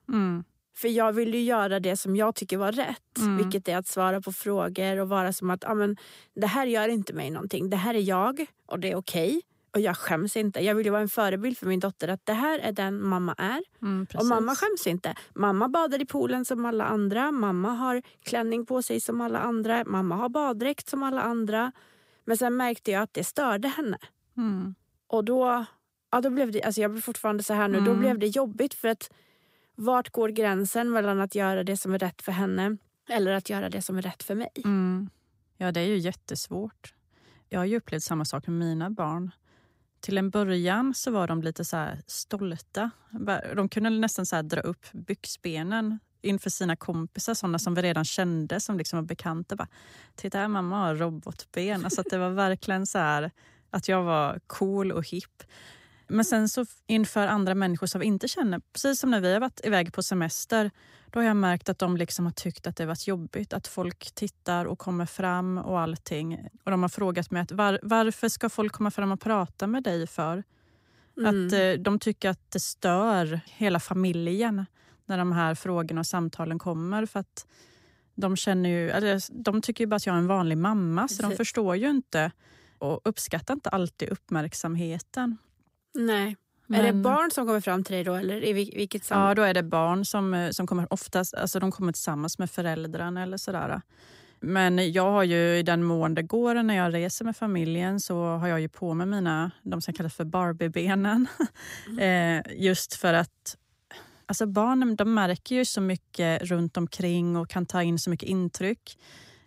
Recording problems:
none

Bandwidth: 15.5 kHz